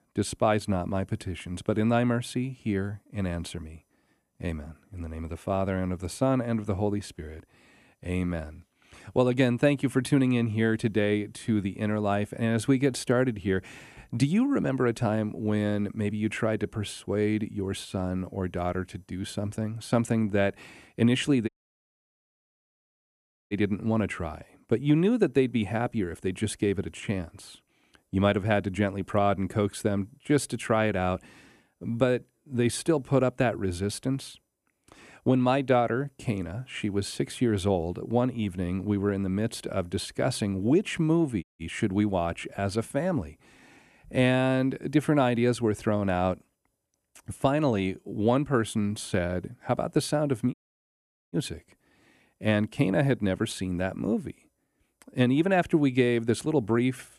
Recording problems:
audio cutting out; at 21 s for 2 s, at 41 s and at 51 s for 1 s

